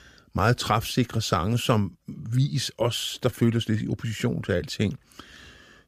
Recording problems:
none

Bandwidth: 15 kHz